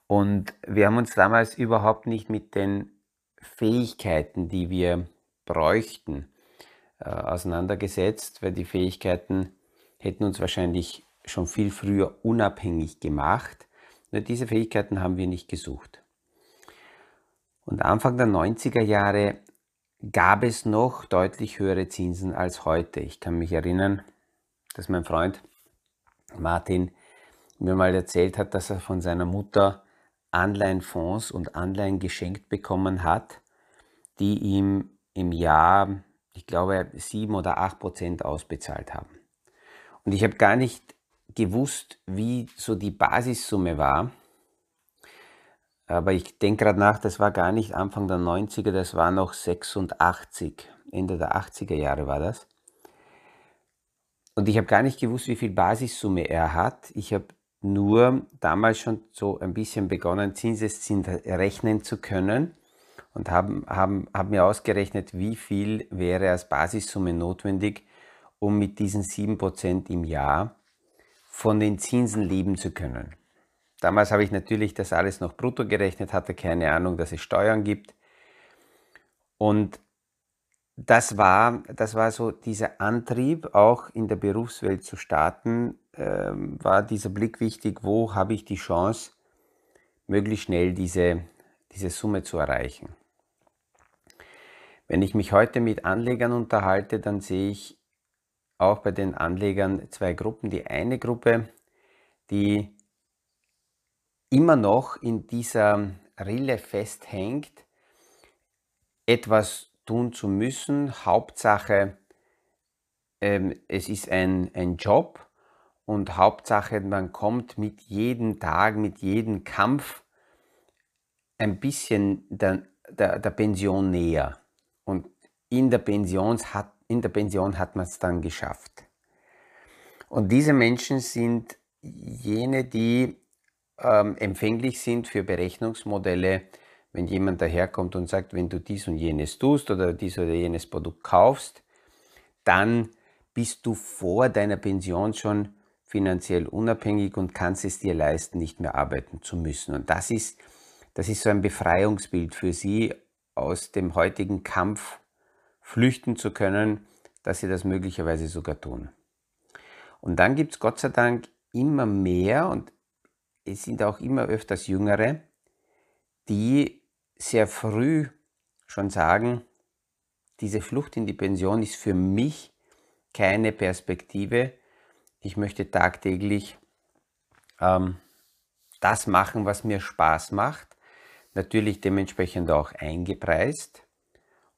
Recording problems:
none

